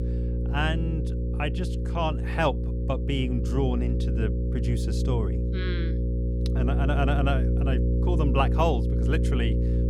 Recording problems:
electrical hum; loud; throughout; 60 Hz, 6 dB below the speech

